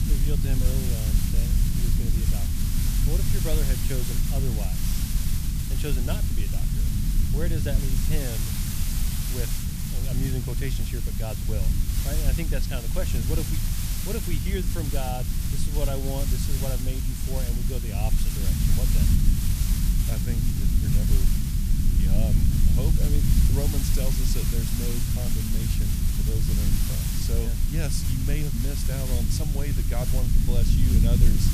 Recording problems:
hiss; loud; throughout; as loud as the speech
low rumble; loud; throughout; 2 dB below the speech

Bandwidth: 14.5 kHz